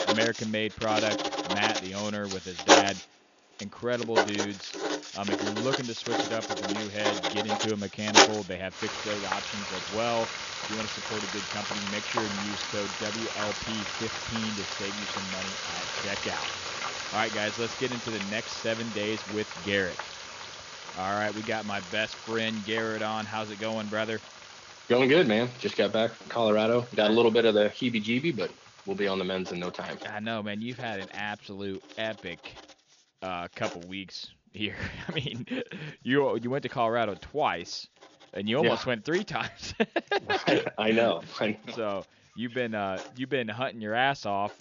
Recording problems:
high frequencies cut off; noticeable; nothing above 7 kHz
household noises; loud; throughout; 1 dB below the speech

